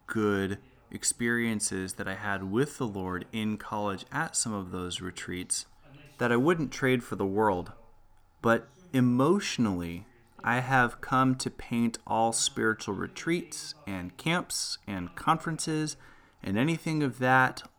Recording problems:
voice in the background; faint; throughout; 30 dB below the speech

